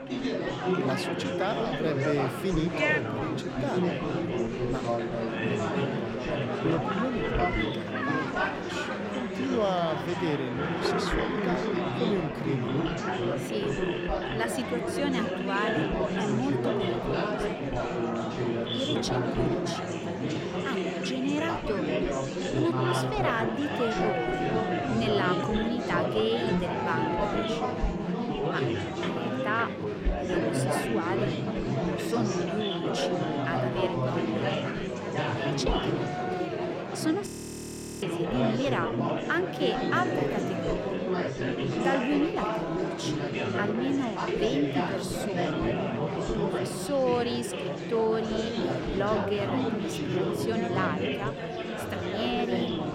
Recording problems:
chatter from many people; very loud; throughout; 3 dB above the speech
audio freezing; at 37 s for 1 s

